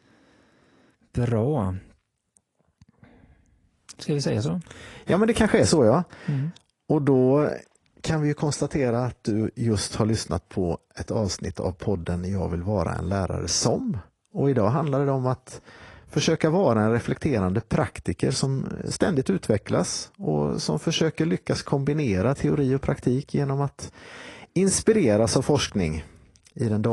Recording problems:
garbled, watery; slightly; nothing above 10 kHz
abrupt cut into speech; at the end

